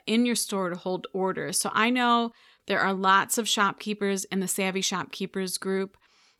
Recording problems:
none

